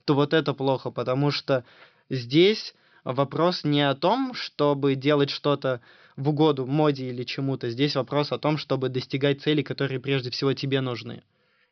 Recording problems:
high frequencies cut off; noticeable; nothing above 5.5 kHz

